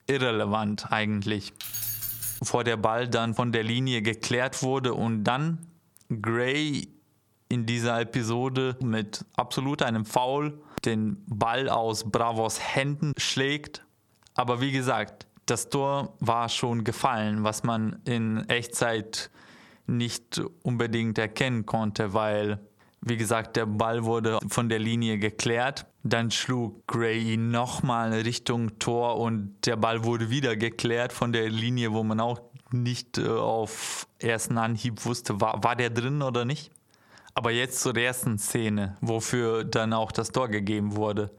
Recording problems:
squashed, flat; heavily
jangling keys; noticeable; at 1.5 s; peak 1 dB below the speech

